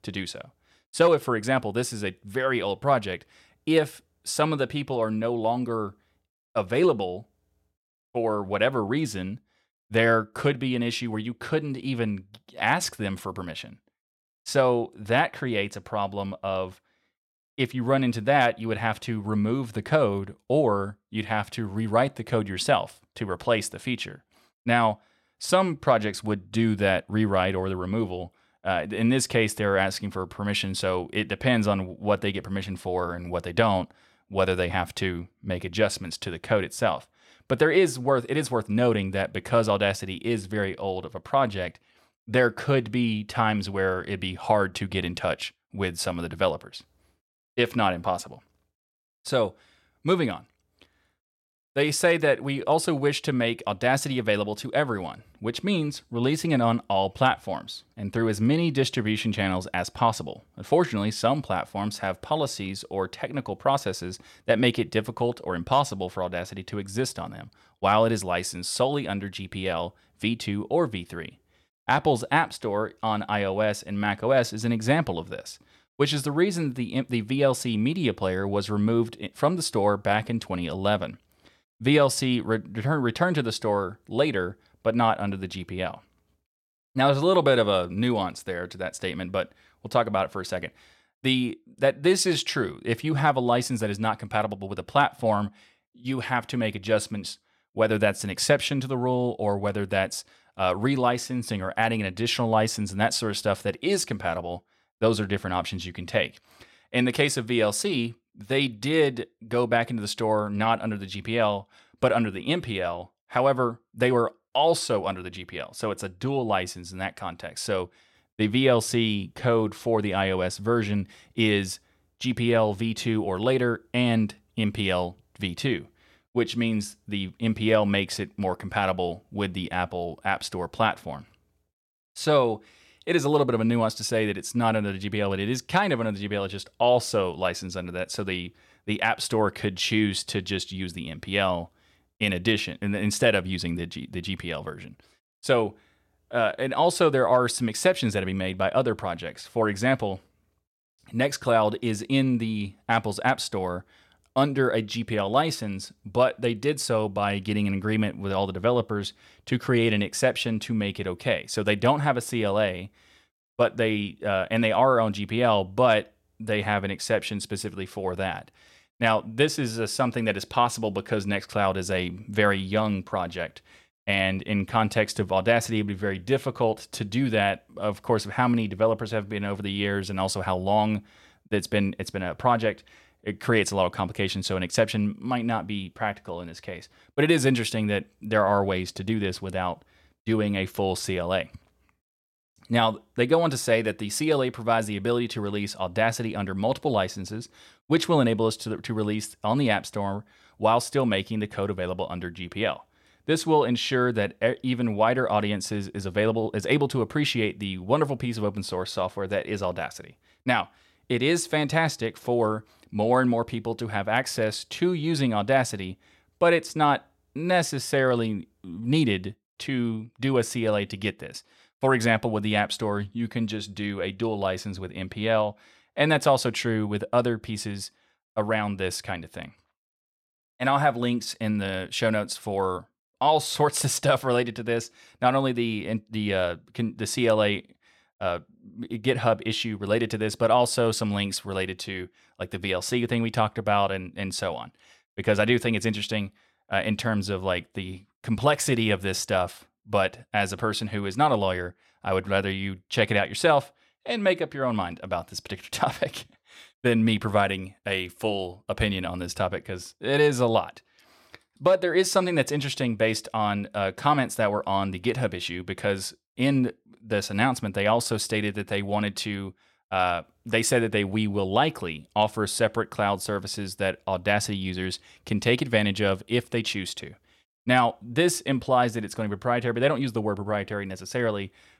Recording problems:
none

